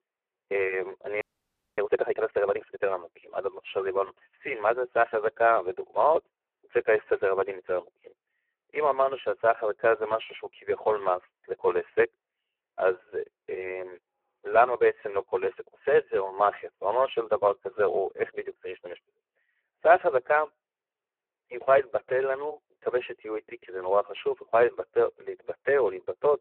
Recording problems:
phone-call audio; poor line
audio freezing; at 1 s for 0.5 s

